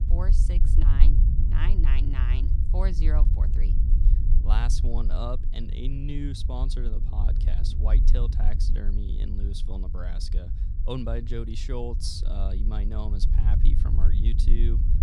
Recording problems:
low rumble; loud; throughout; 6 dB below the speech
wind noise on the microphone; occasional gusts; 25 dB below the speech

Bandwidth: 15.5 kHz